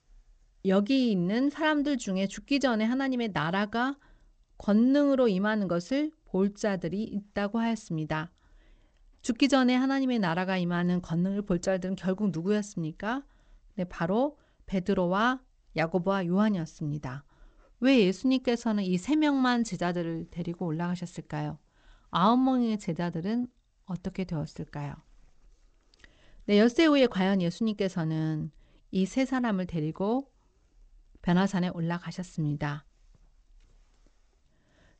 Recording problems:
garbled, watery; slightly; nothing above 8 kHz

